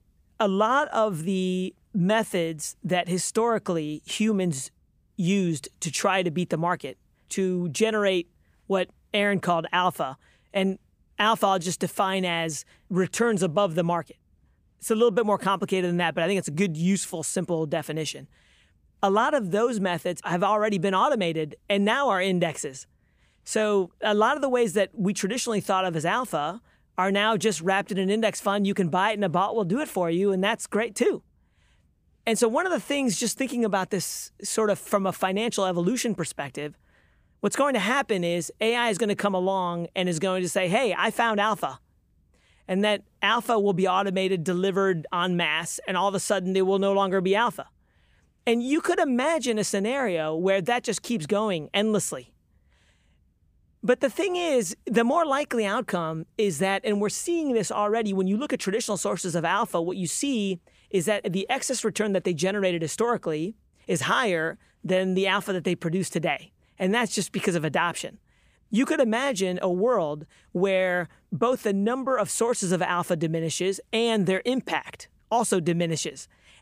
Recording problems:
none

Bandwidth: 15 kHz